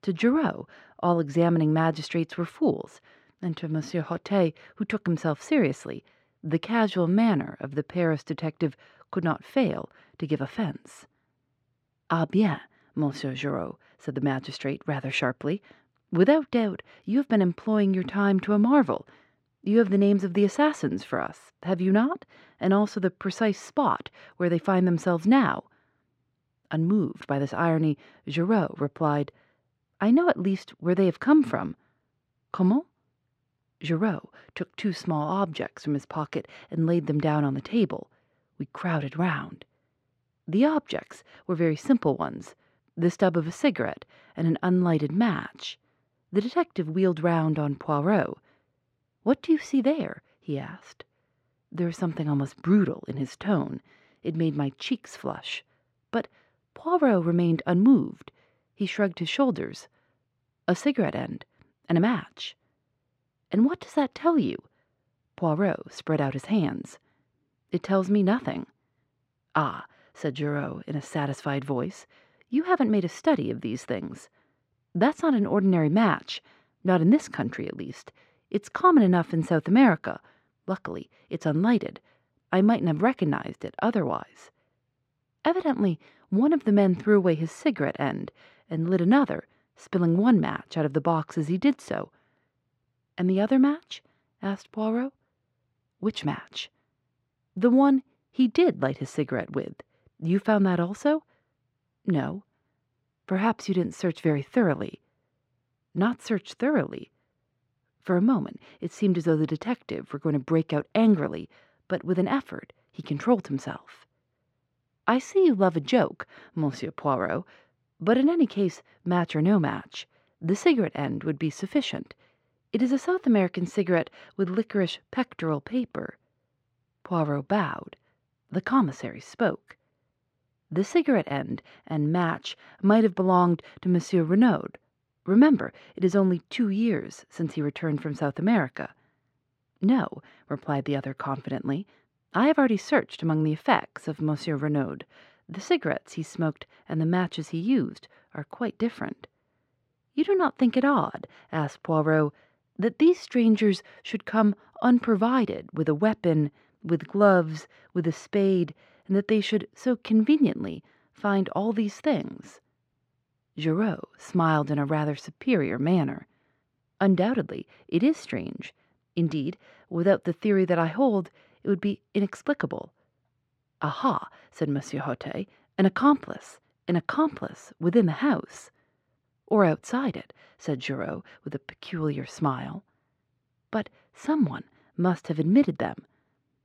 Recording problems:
muffled; slightly; fading above 3 kHz

